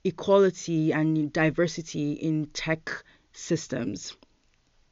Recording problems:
high frequencies cut off; noticeable; nothing above 7 kHz

